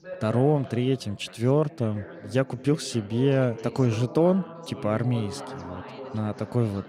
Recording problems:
background chatter; noticeable; throughout; 3 voices, 15 dB below the speech

